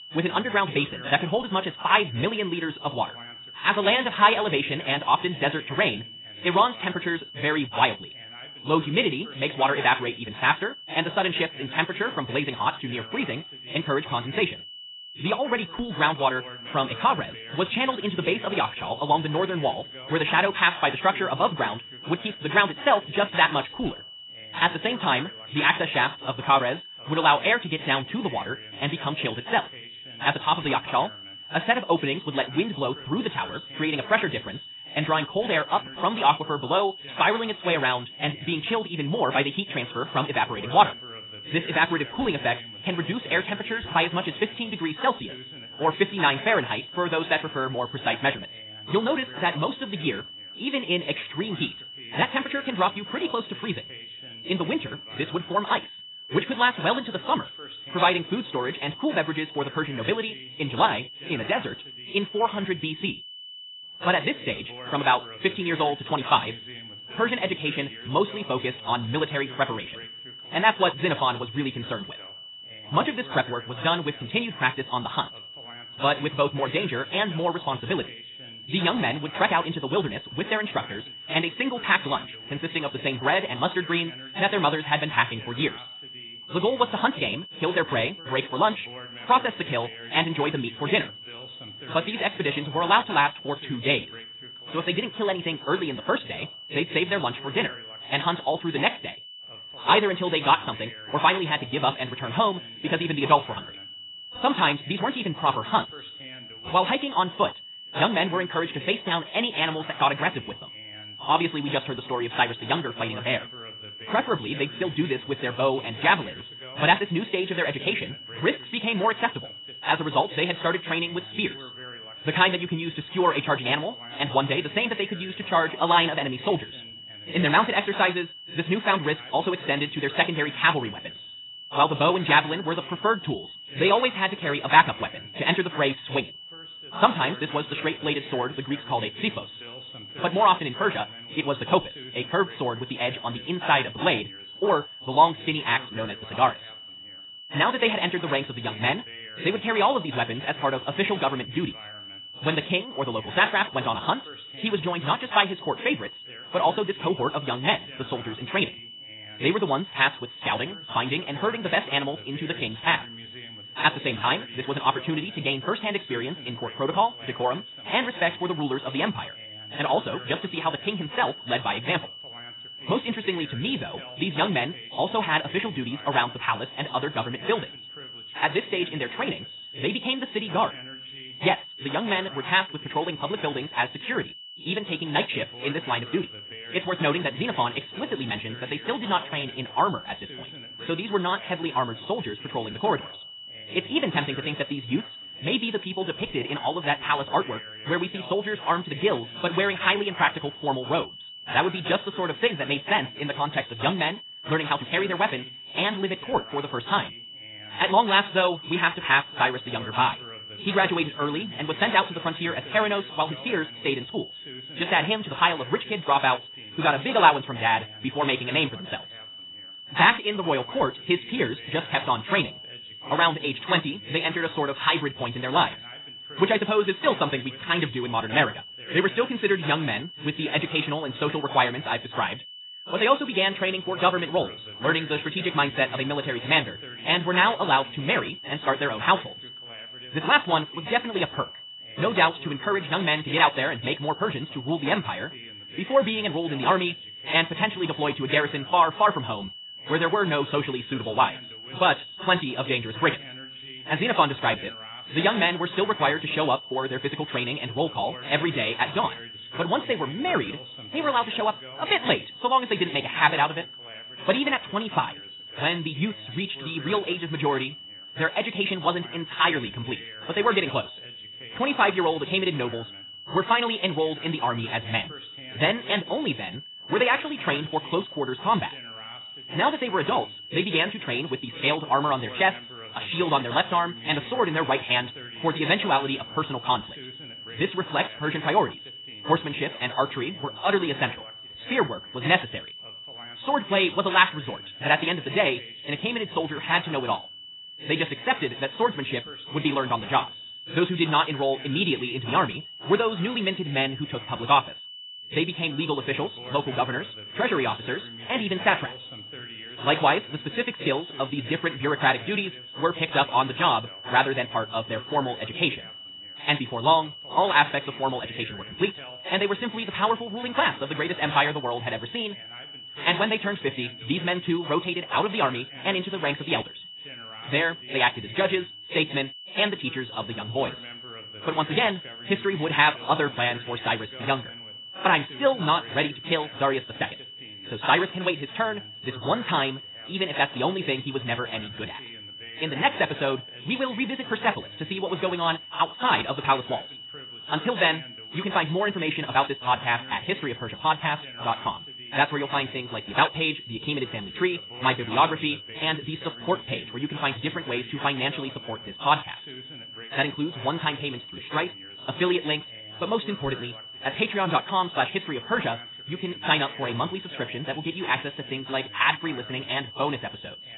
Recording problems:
garbled, watery; badly; nothing above 4 kHz
wrong speed, natural pitch; too fast; 1.8 times normal speed
high-pitched whine; noticeable; throughout; 3 kHz, 15 dB below the speech
voice in the background; faint; throughout; 20 dB below the speech

